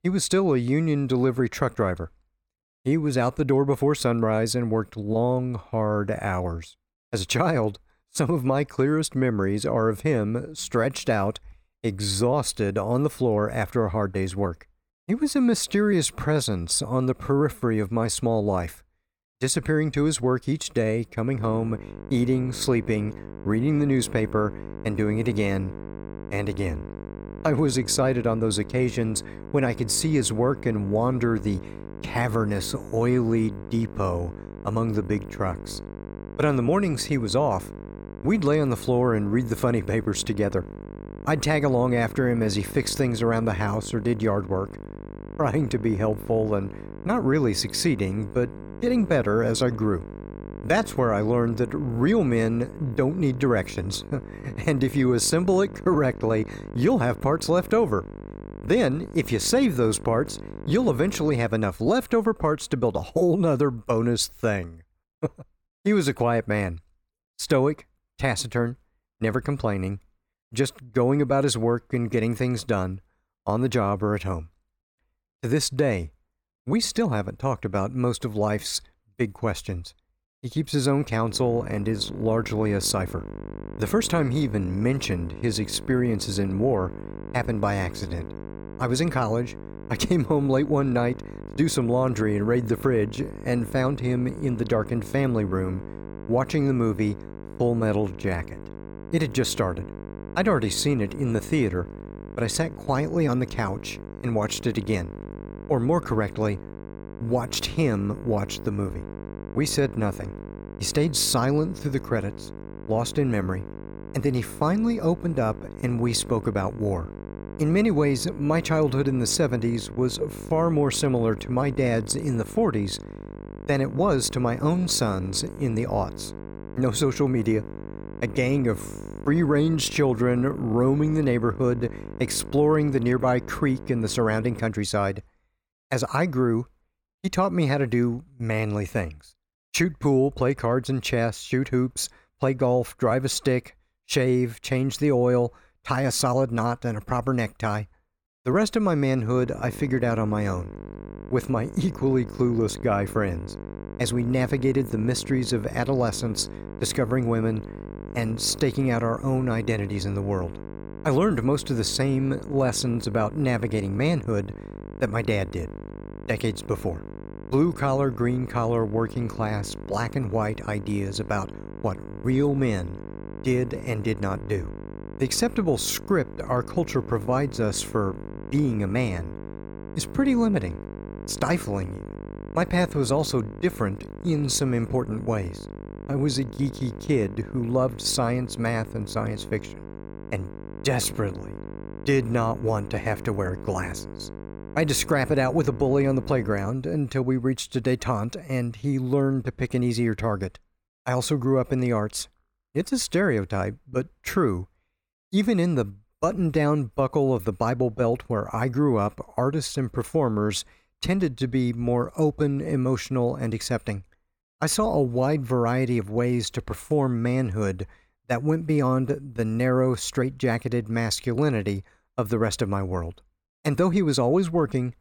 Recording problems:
electrical hum; noticeable; from 21 s to 1:01, from 1:21 to 2:15 and from 2:29 to 3:17; 50 Hz, 15 dB below the speech

